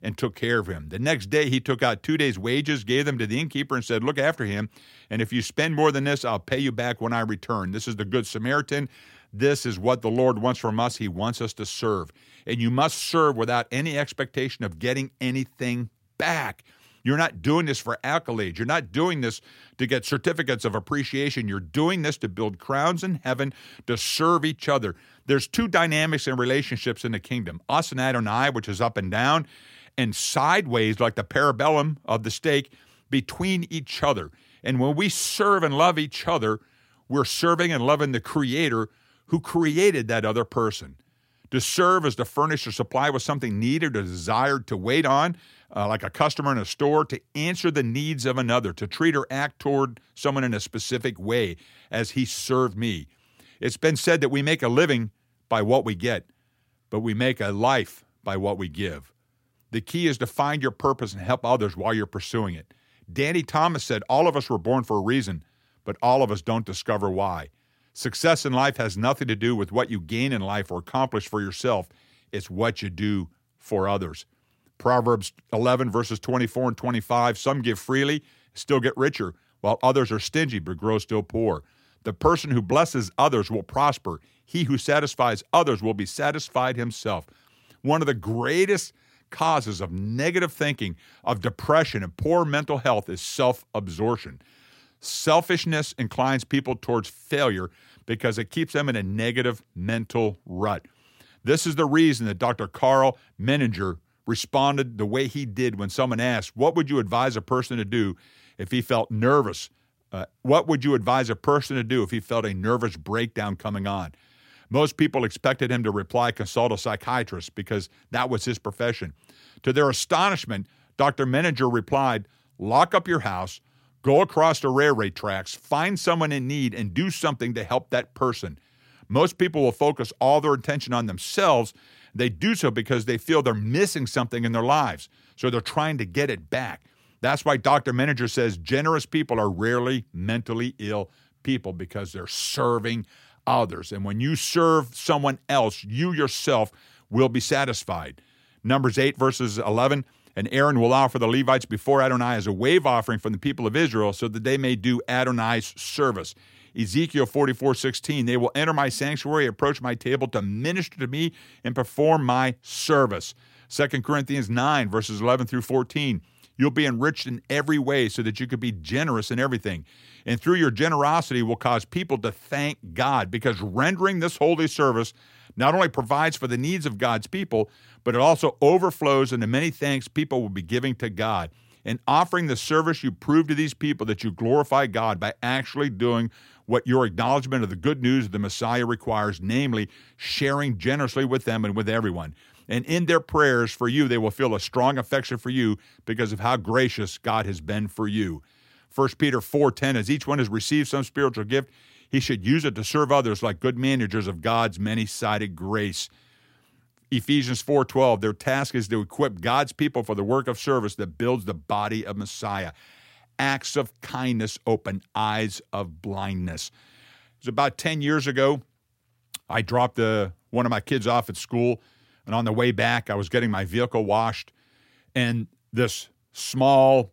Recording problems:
none

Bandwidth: 16 kHz